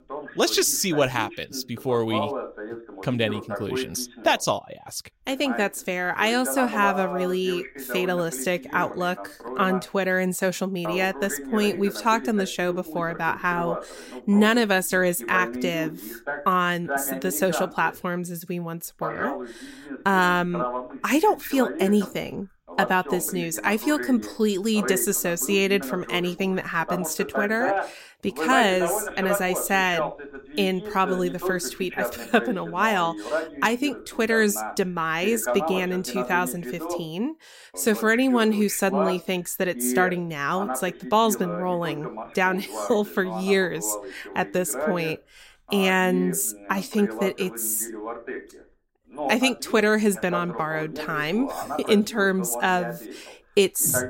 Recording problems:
voice in the background; loud; throughout; 9 dB below the speech

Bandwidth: 16 kHz